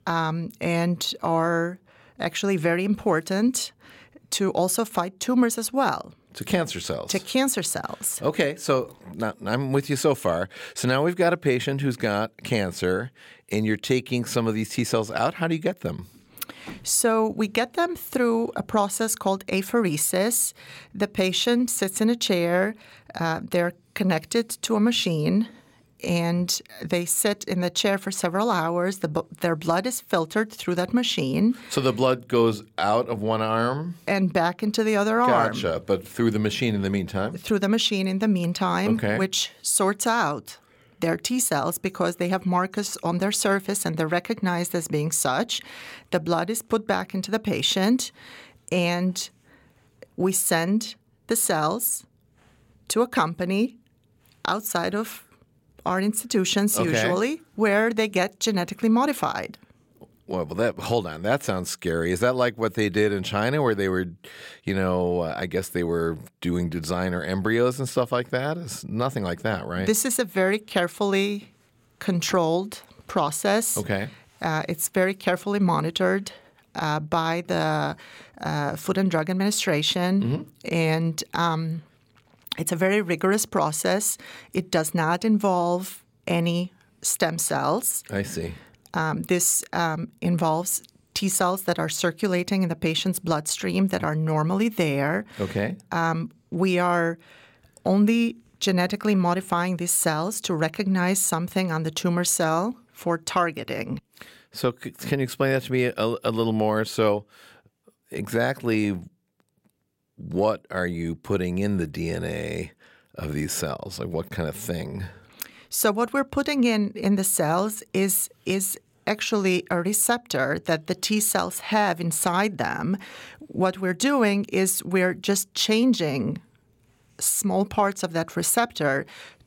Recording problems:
none

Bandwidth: 16.5 kHz